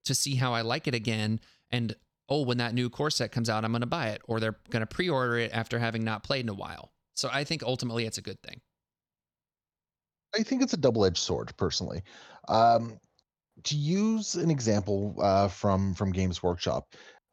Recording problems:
none

